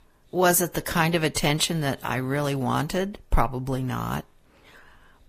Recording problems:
garbled, watery; slightly; nothing above 15 kHz

